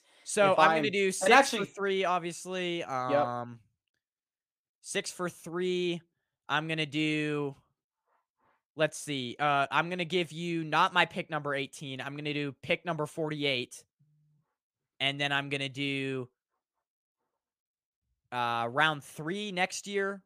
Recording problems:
none

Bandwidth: 15 kHz